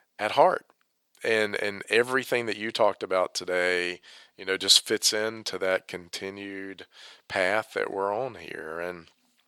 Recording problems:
thin; very; fading below 500 Hz

